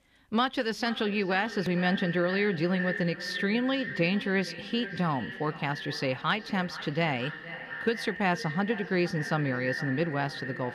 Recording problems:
echo of what is said; strong; throughout; 460 ms later, 8 dB below the speech

